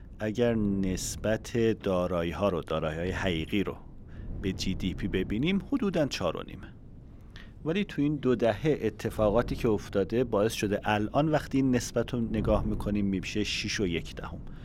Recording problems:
wind noise on the microphone; occasional gusts; 20 dB below the speech

